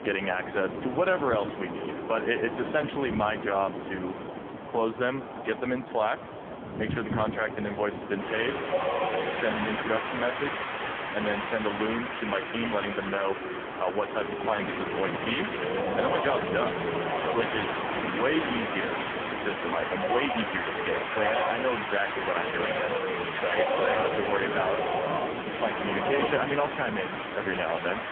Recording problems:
phone-call audio; poor line; nothing above 3.5 kHz
wind in the background; loud; throughout; 2 dB below the speech

